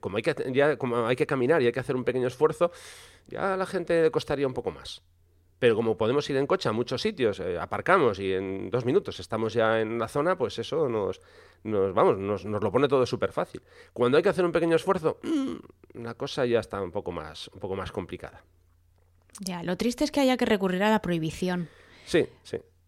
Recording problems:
none

